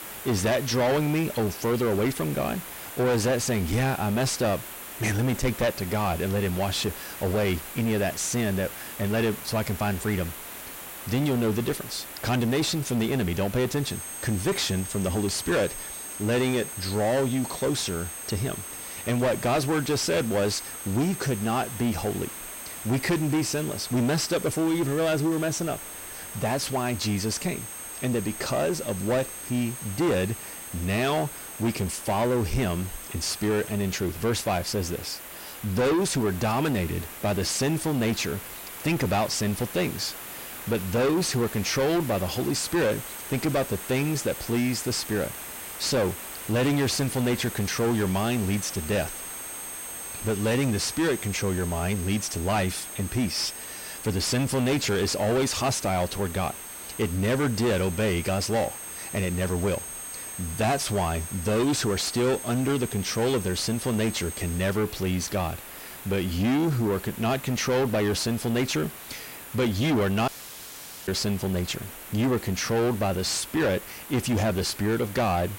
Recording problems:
distortion; heavy; 6 dB below the speech
high-pitched whine; noticeable; from 14 to 34 s and from 42 s to 1:05; 8.5 kHz, 10 dB below the speech
hiss; noticeable; throughout; 10 dB below the speech
audio cutting out; at 1:10 for 1 s

